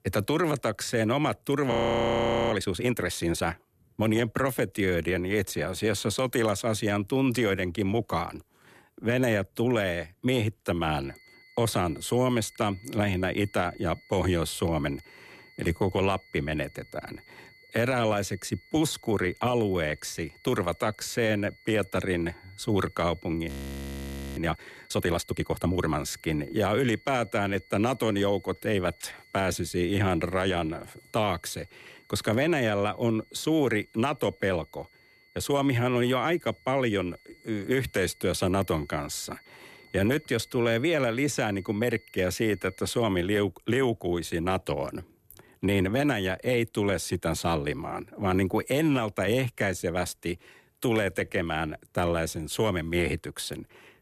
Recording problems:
high-pitched whine; faint; from 11 to 43 s; 2 kHz, 25 dB below the speech
audio freezing; at 1.5 s for 1 s and at 23 s for 1 s

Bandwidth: 14.5 kHz